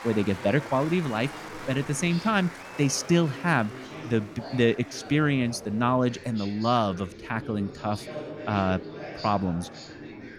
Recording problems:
chatter from many people; noticeable; throughout; 15 dB below the speech

